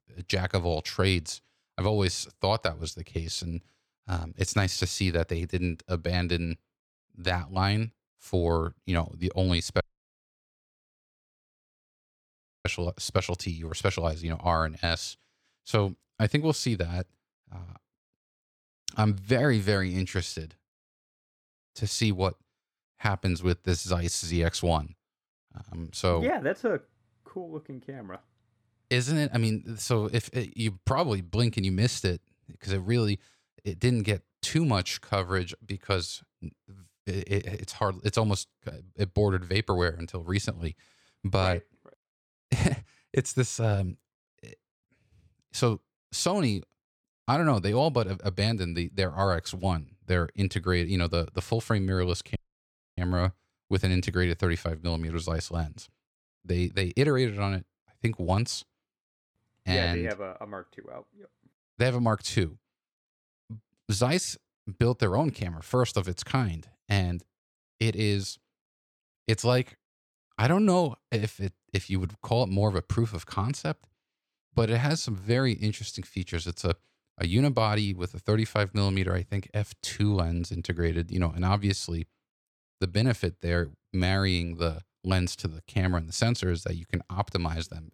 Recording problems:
audio cutting out; at 10 s for 3 s and at 52 s for 0.5 s

